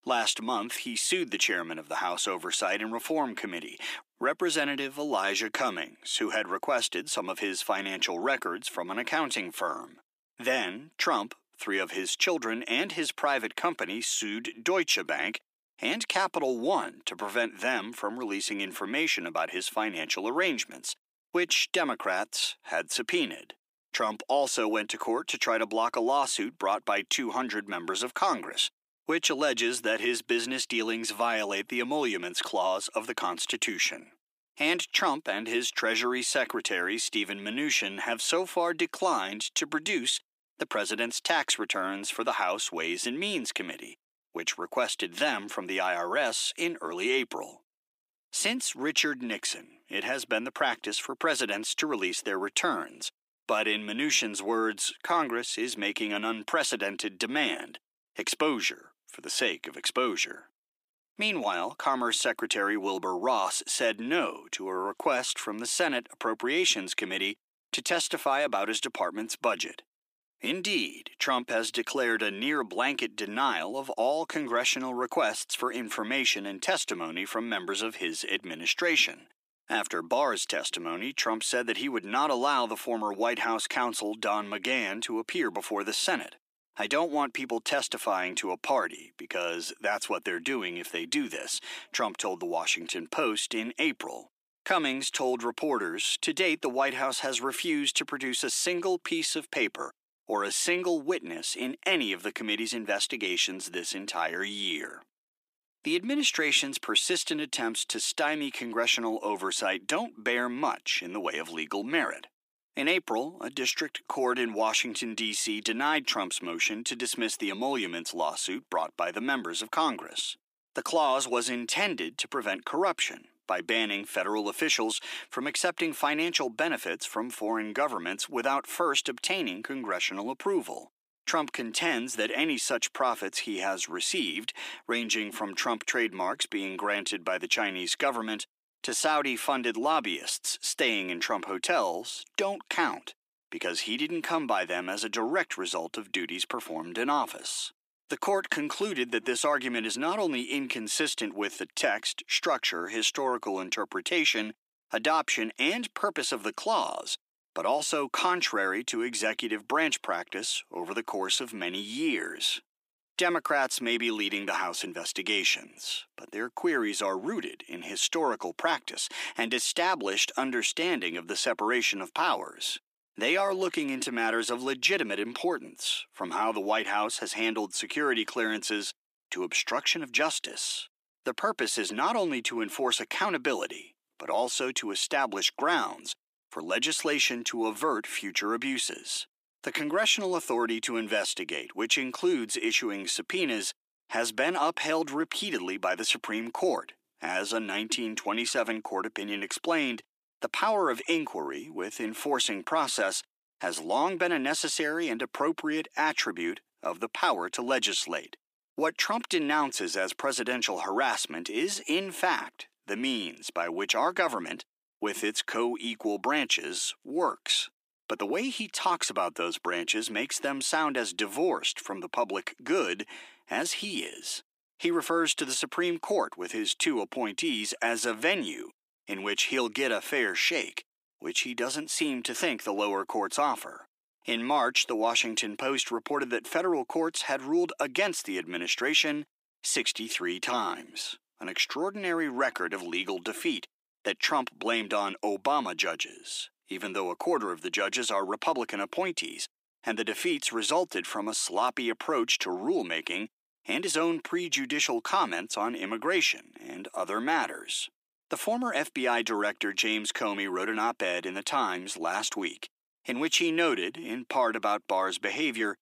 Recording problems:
thin; somewhat; fading below 300 Hz

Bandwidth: 15 kHz